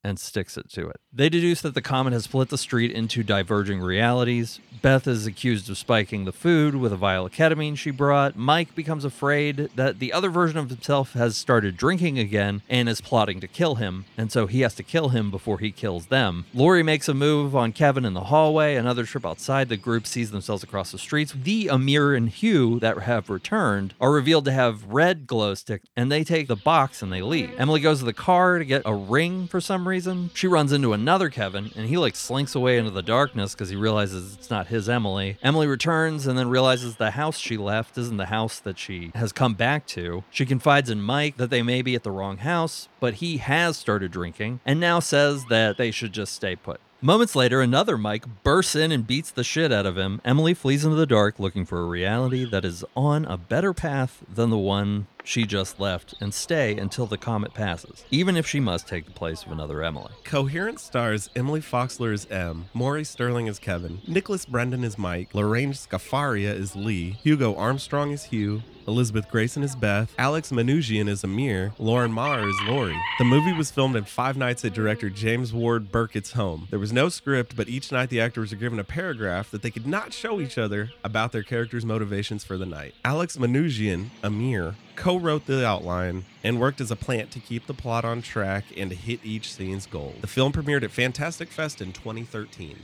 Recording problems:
animal sounds; noticeable; throughout; 20 dB below the speech

